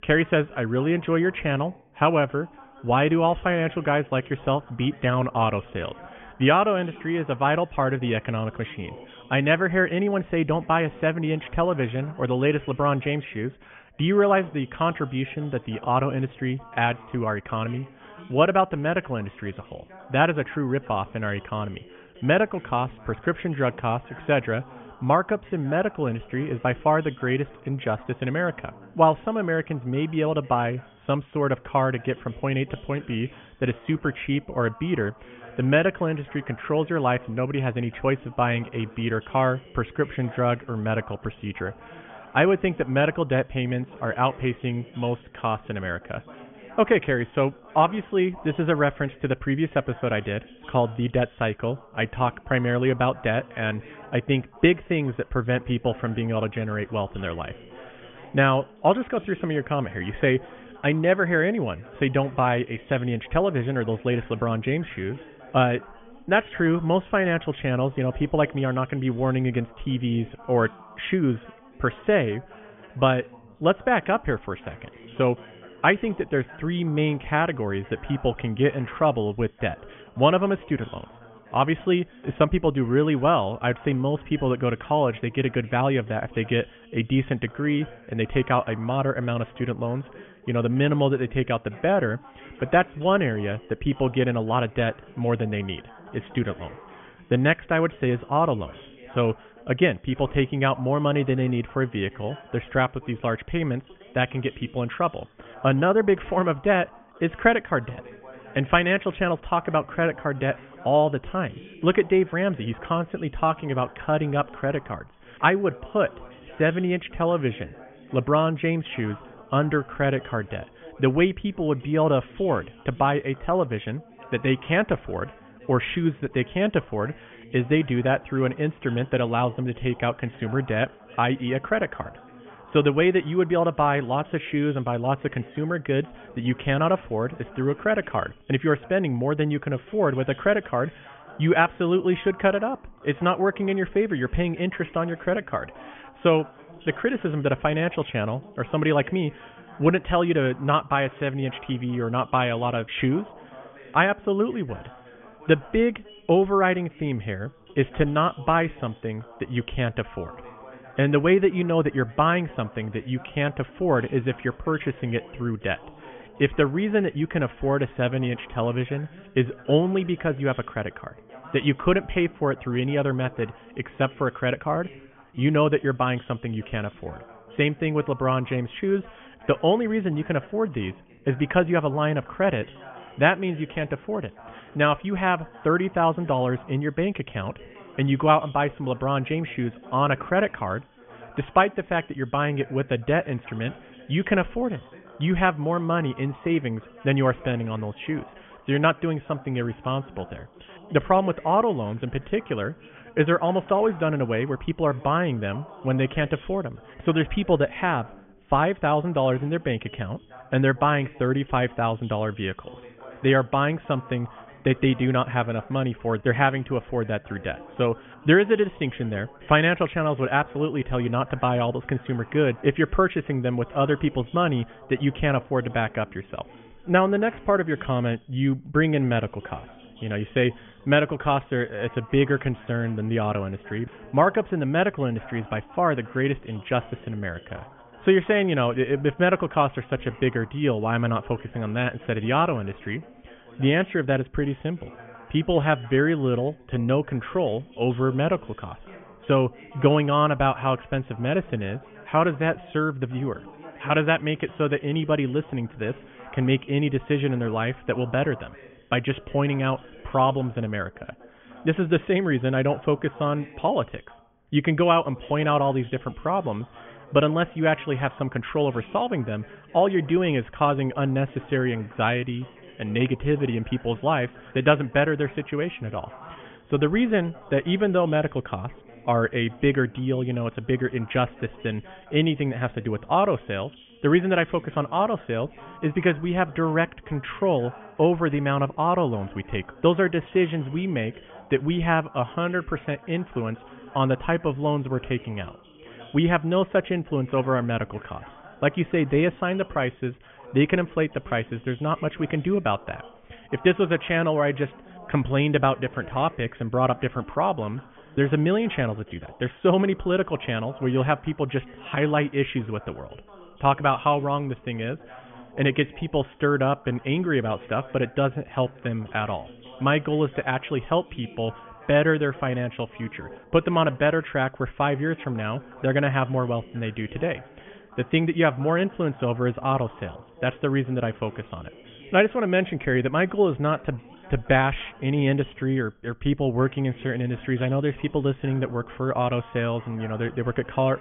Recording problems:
high frequencies cut off; severe; nothing above 3.5 kHz
background chatter; faint; throughout; 2 voices, 20 dB below the speech

